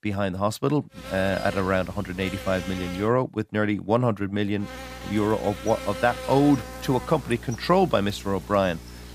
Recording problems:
electrical hum; noticeable; from 1 to 3 s and from 4.5 s on; 60 Hz, 10 dB below the speech

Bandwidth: 15 kHz